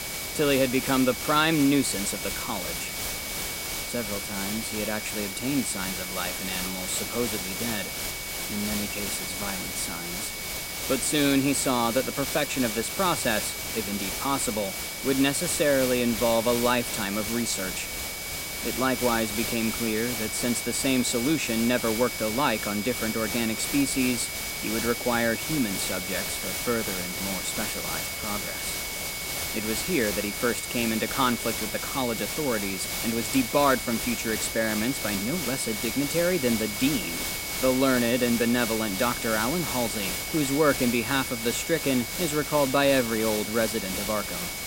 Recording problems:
high-pitched whine; loud; throughout; 2 kHz, 10 dB below the speech
hiss; loud; throughout; 3 dB below the speech

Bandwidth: 16 kHz